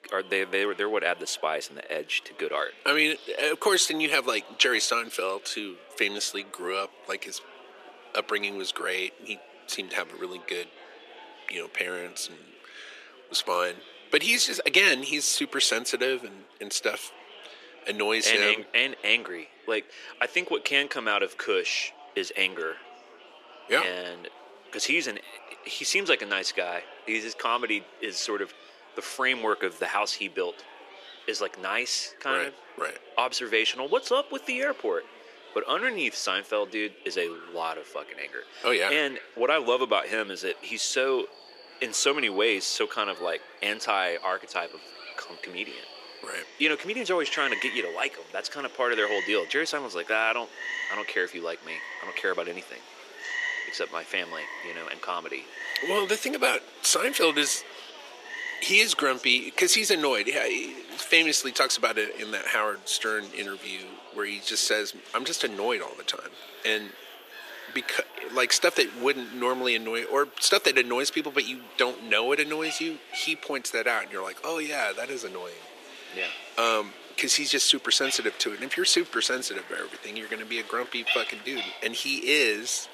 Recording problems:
thin; very; fading below 350 Hz
animal sounds; noticeable; from 41 s on; 10 dB below the speech
murmuring crowd; faint; throughout; 20 dB below the speech

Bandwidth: 14 kHz